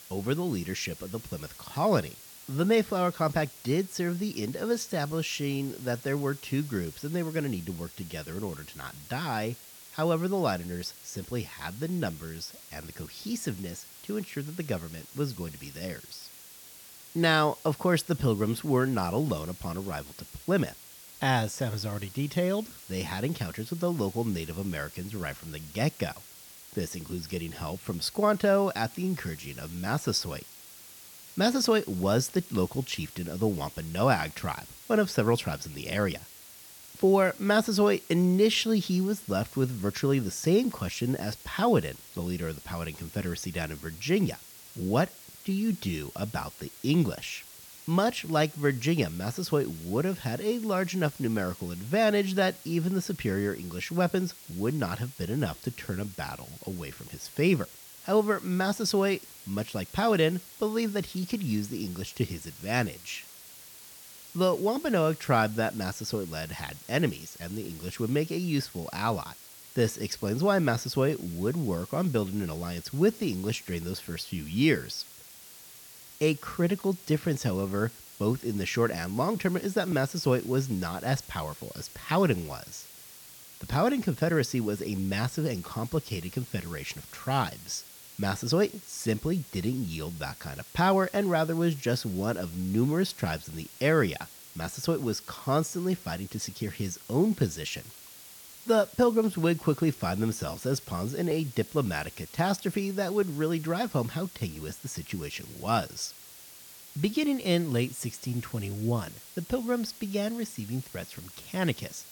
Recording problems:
hiss; noticeable; throughout; 15 dB below the speech

